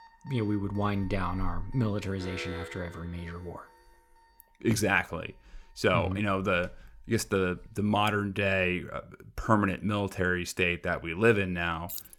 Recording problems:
alarms or sirens; faint; throughout; 30 dB below the speech
alarm; noticeable; from 2 to 3.5 s; peak 10 dB below the speech
jangling keys; very faint; at 12 s; peak 10 dB below the speech

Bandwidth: 17.5 kHz